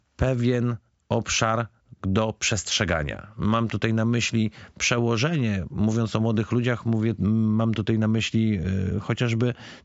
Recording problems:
high frequencies cut off; noticeable; nothing above 8 kHz

